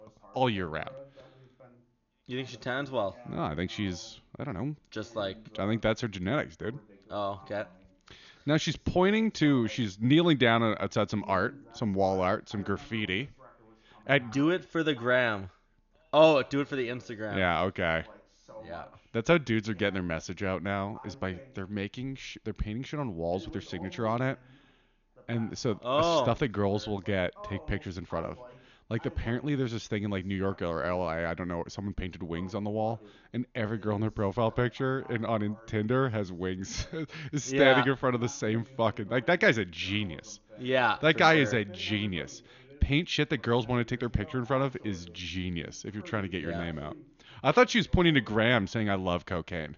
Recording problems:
high frequencies cut off; noticeable; nothing above 7 kHz
voice in the background; faint; throughout; 20 dB below the speech

